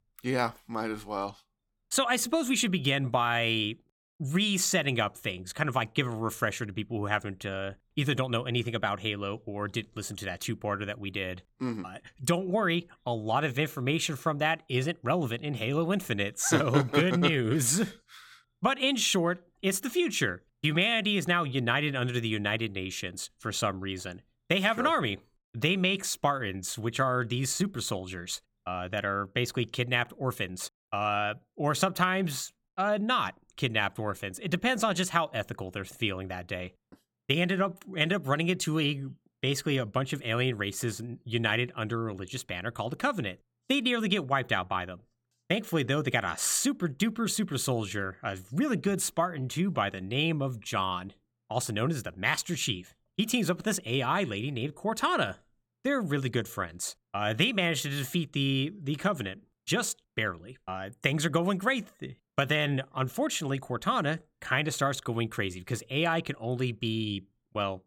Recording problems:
none

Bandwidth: 17 kHz